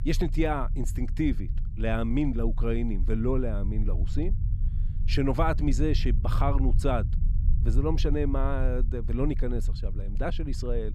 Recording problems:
low rumble; noticeable; throughout; 15 dB below the speech

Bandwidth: 14 kHz